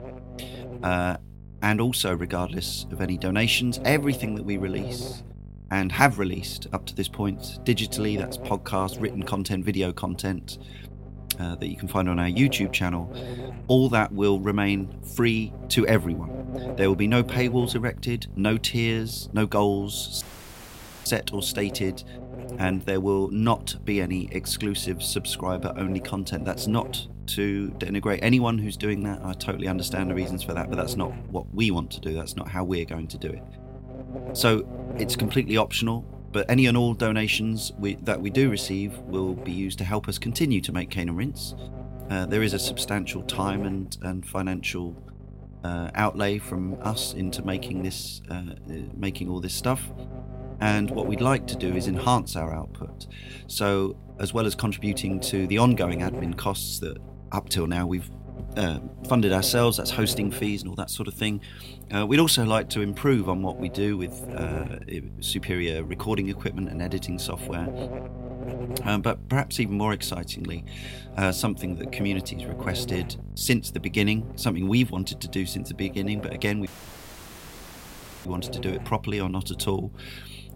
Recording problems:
electrical hum; noticeable; throughout; 50 Hz, 15 dB below the speech
audio cutting out; at 20 s for 1 s and at 1:17 for 1.5 s

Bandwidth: 16 kHz